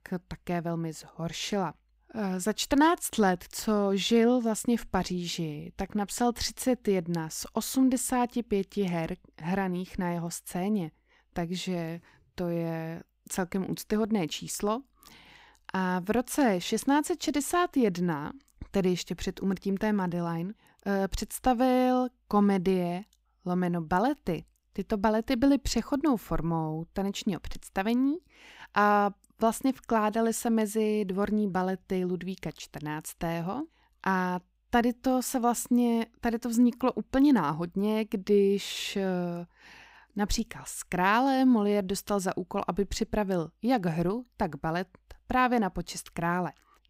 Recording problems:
none

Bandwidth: 15.5 kHz